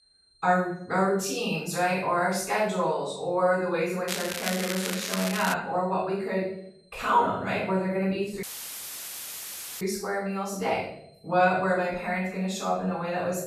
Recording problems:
off-mic speech; far
room echo; noticeable; dies away in 0.7 s
crackling; loud; from 4 to 5.5 s; 5 dB below the speech
high-pitched whine; faint; throughout; 4 kHz, 35 dB below the speech
audio cutting out; filled with static; at 8.5 s for 1.5 s

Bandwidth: 14 kHz